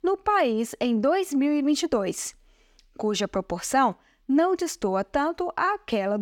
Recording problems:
abrupt cut into speech; at the end

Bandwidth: 17.5 kHz